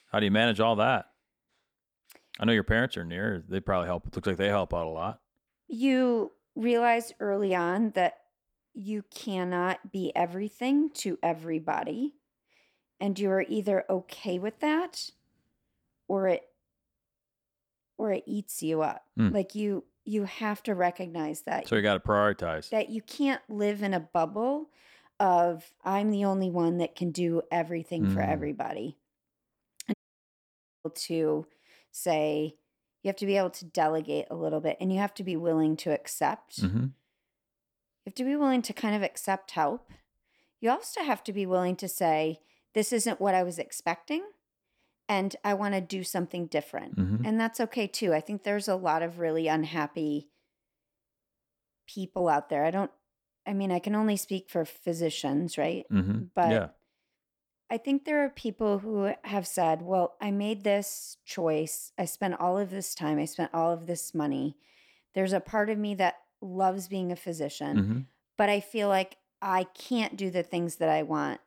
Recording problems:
audio cutting out; at 30 s for 1 s

